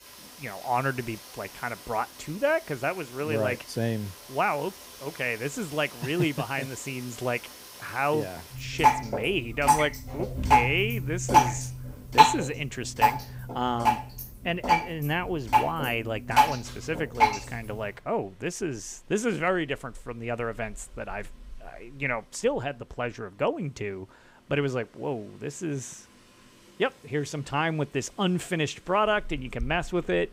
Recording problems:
rain or running water; very loud; throughout; 4 dB above the speech

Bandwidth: 15.5 kHz